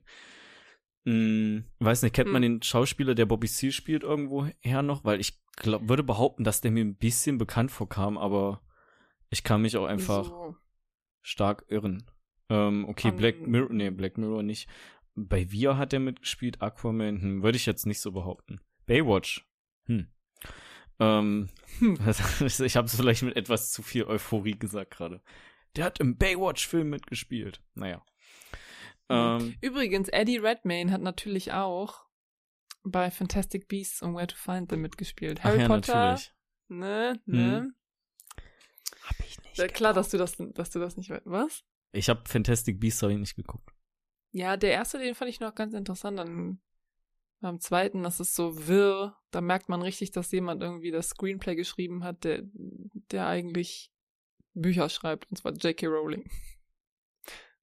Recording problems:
none

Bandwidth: 14.5 kHz